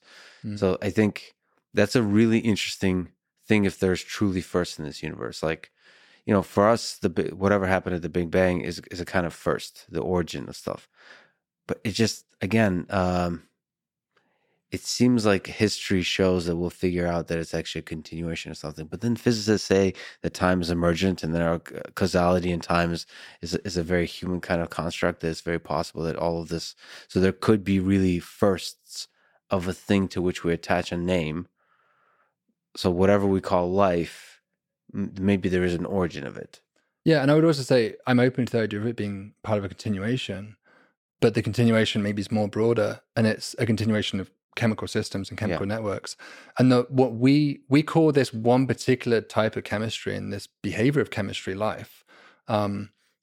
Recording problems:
none

